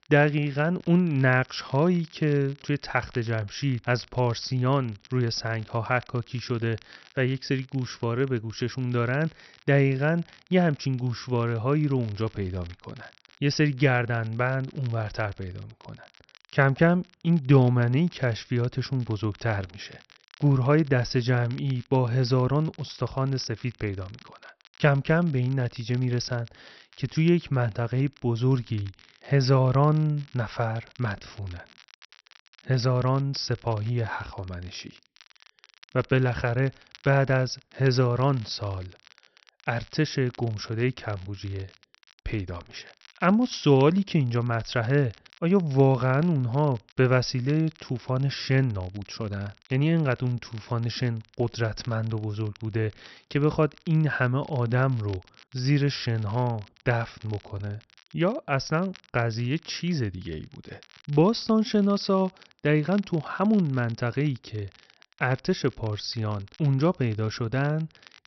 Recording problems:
high frequencies cut off; noticeable; nothing above 5.5 kHz
crackle, like an old record; faint; 25 dB below the speech

